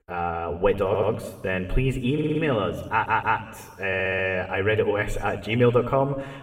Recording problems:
room echo; slight; dies away in 1.3 s
off-mic speech; somewhat distant
audio stuttering; 4 times, first at 1 s

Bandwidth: 16 kHz